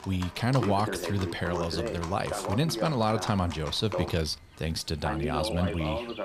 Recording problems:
voice in the background; loud; throughout; 6 dB below the speech
animal sounds; noticeable; throughout; 15 dB below the speech

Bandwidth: 15 kHz